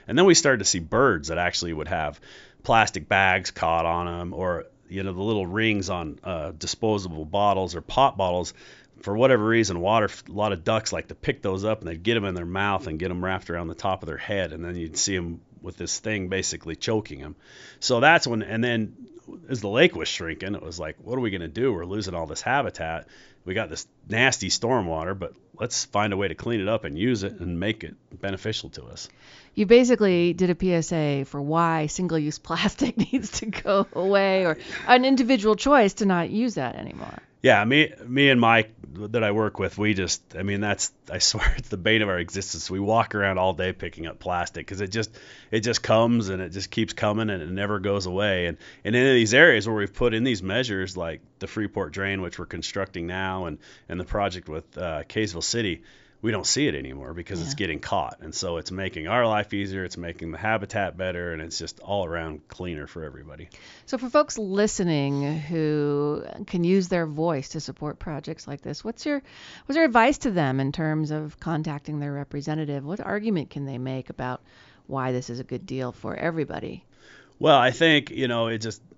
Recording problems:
high frequencies cut off; noticeable; nothing above 7.5 kHz

